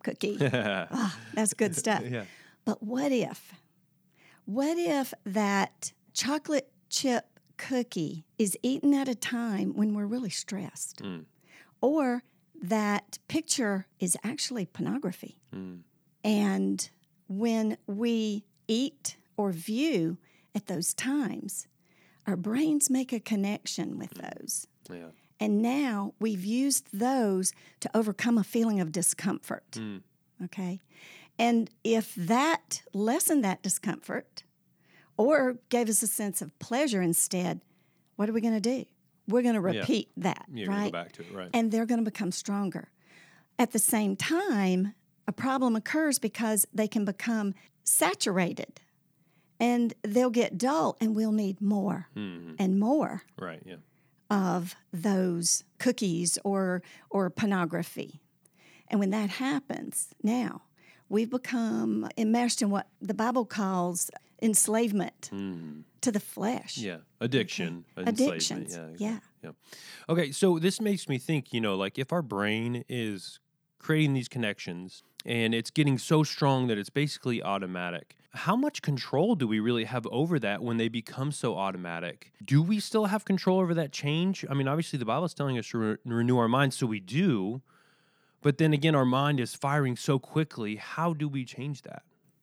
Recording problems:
none

